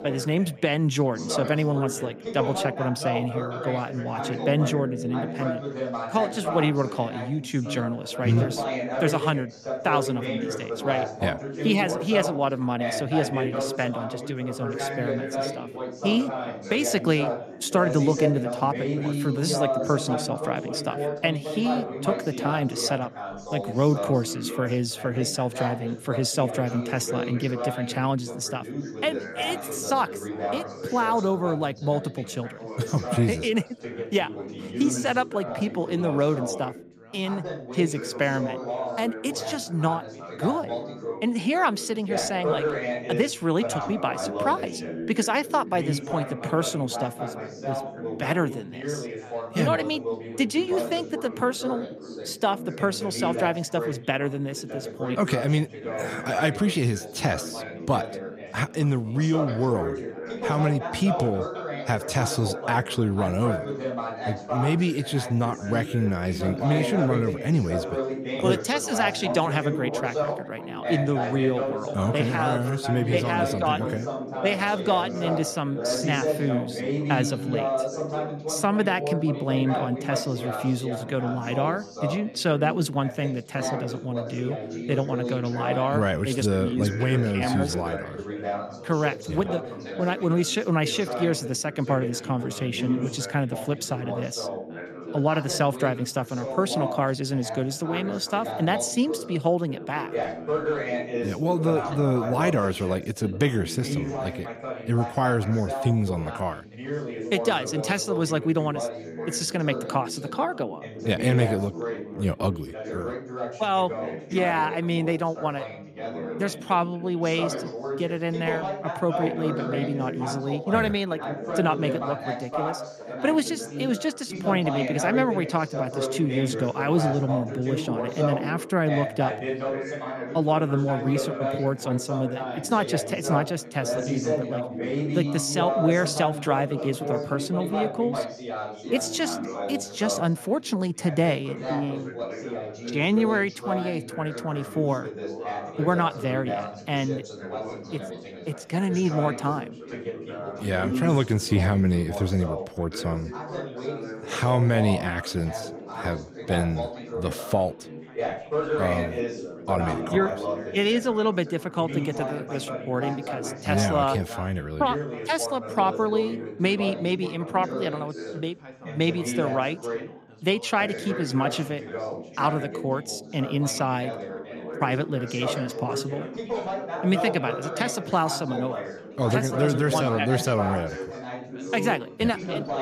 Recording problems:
background chatter; loud; throughout; 3 voices, 5 dB below the speech

